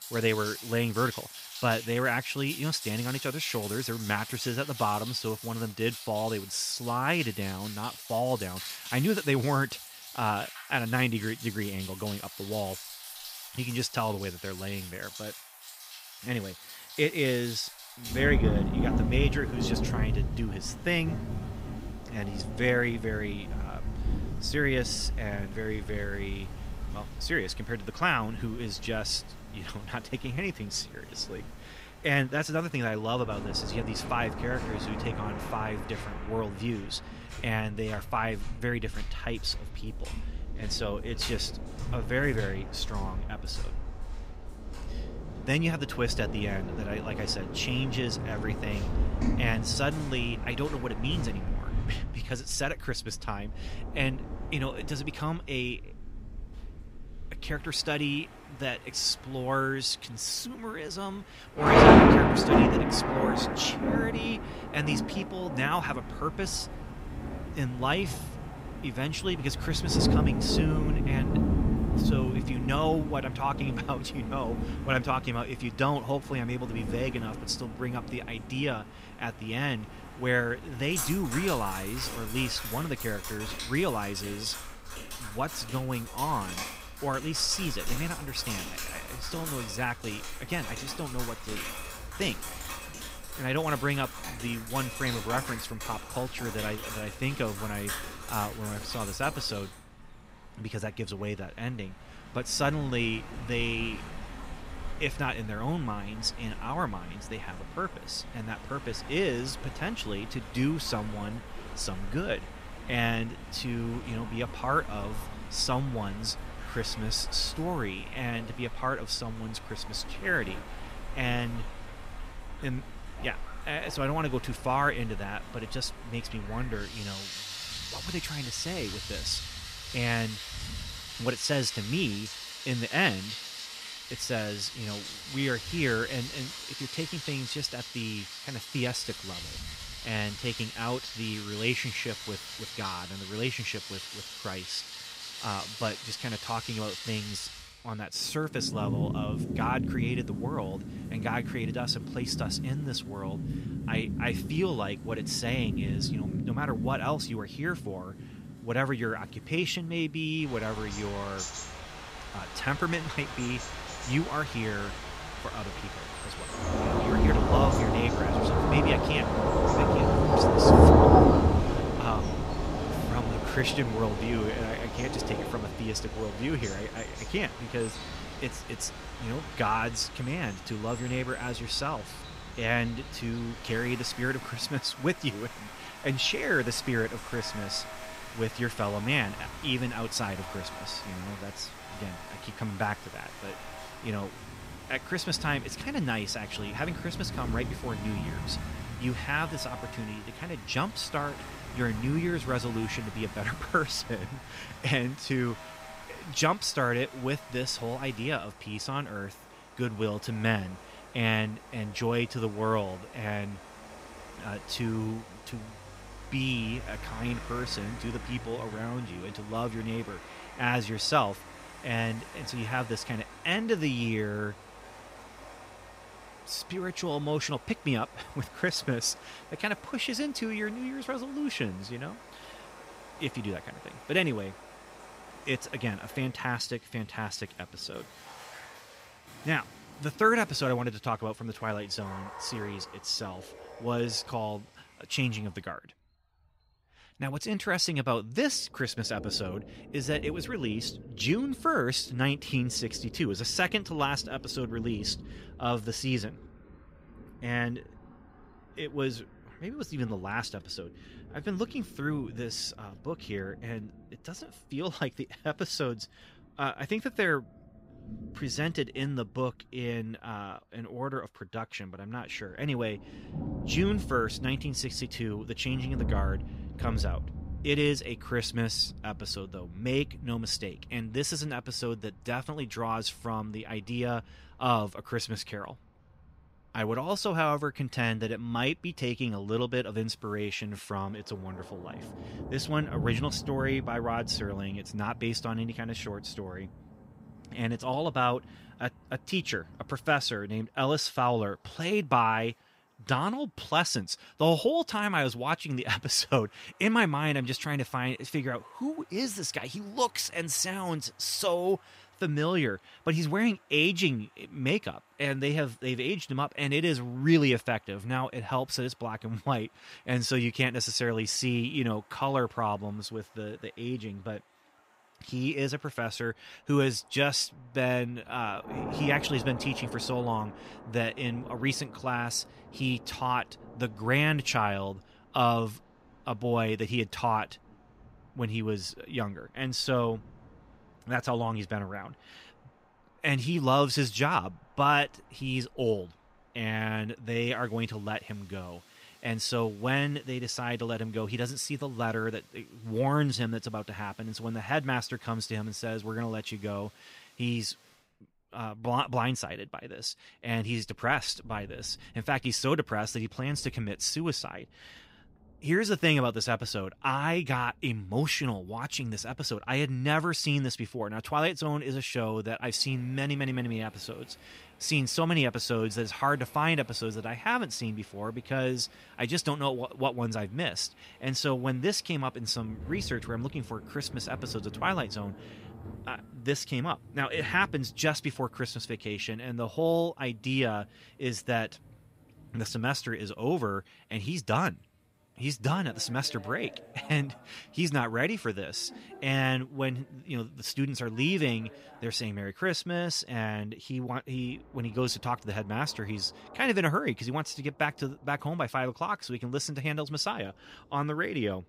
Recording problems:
rain or running water; loud; throughout; 2 dB below the speech

